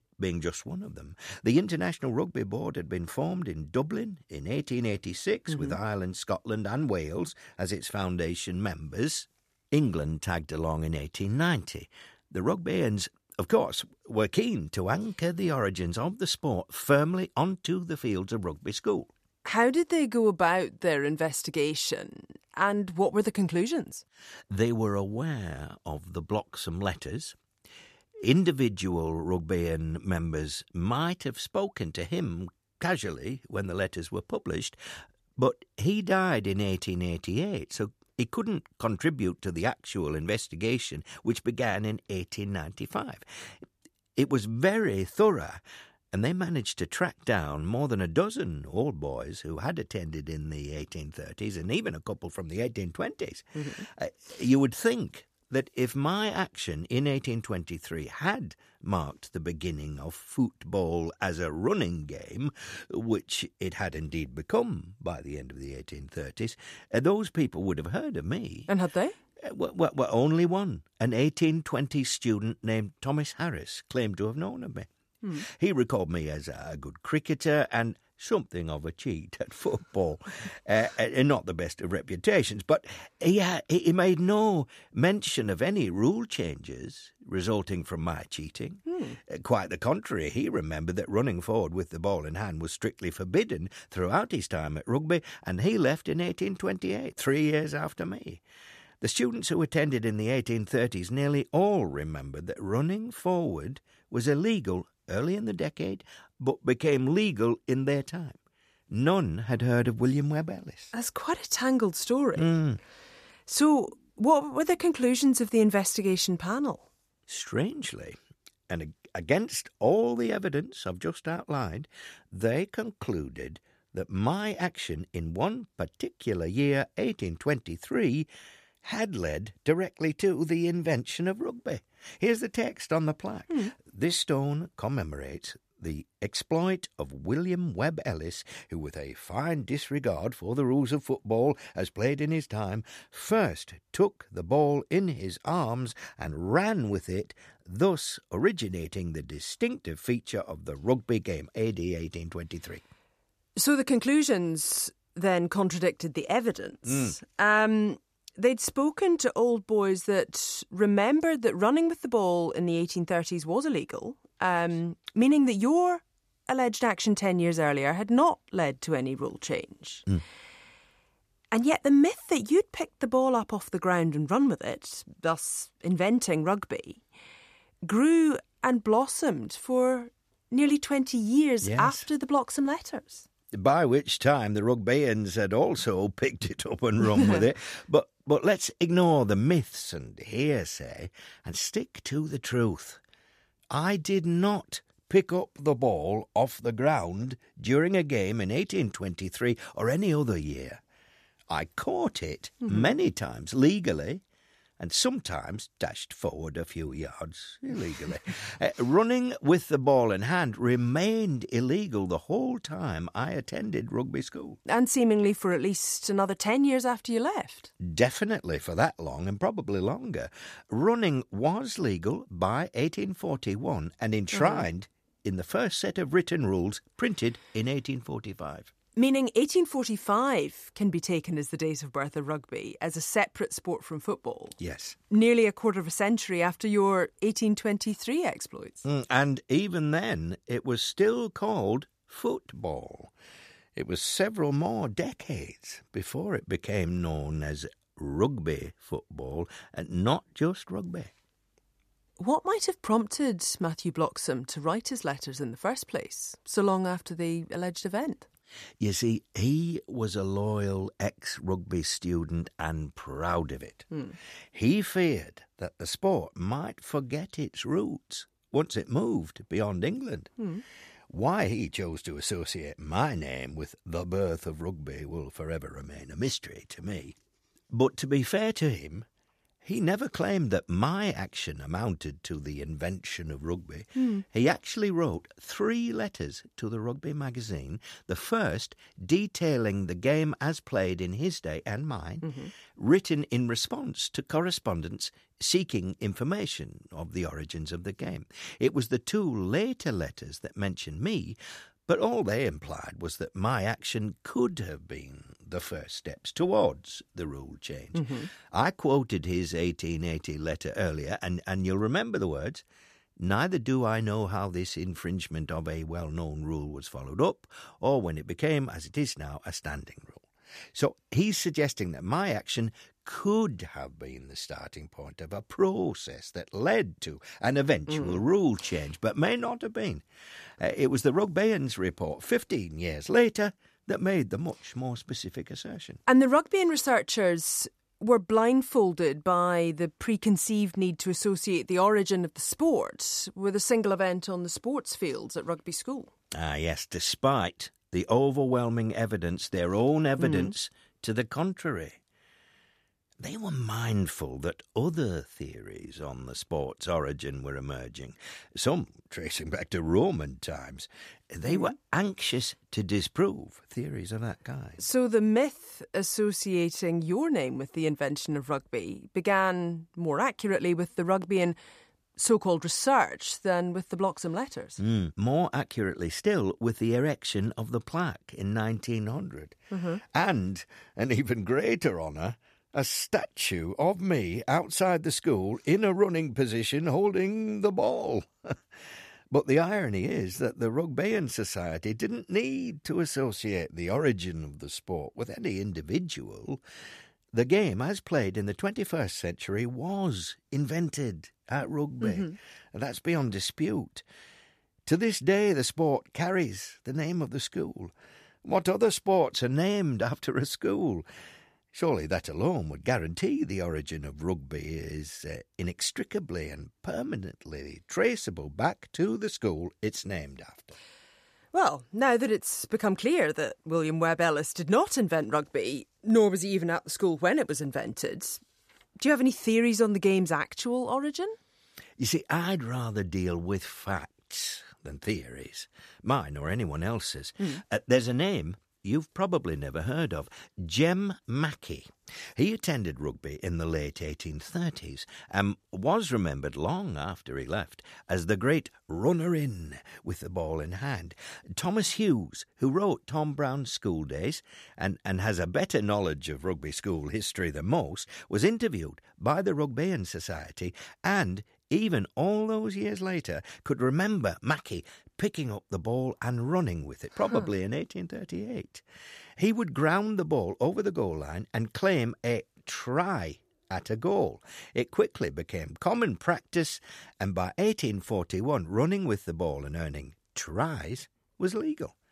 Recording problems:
none

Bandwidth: 14.5 kHz